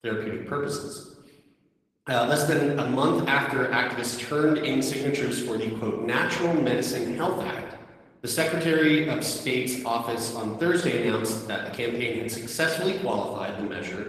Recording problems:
room echo; noticeable; dies away in 1 s
off-mic speech; somewhat distant
garbled, watery; slightly; nothing above 14 kHz
thin; very slightly; fading below 450 Hz

